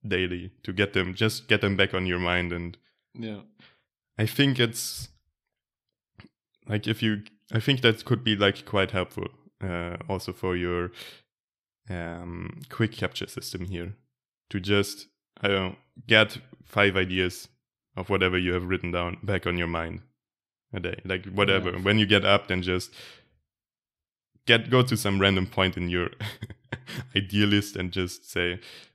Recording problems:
none

